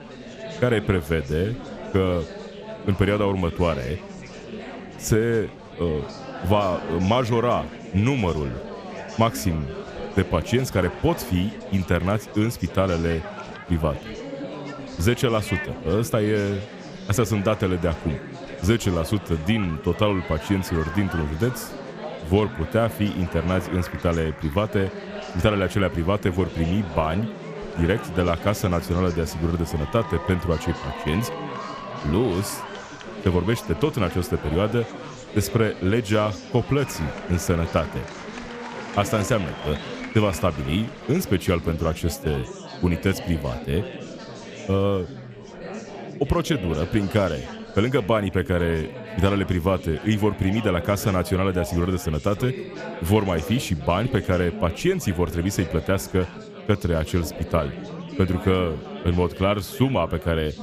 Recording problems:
chatter from many people; noticeable; throughout; 10 dB below the speech

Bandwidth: 14.5 kHz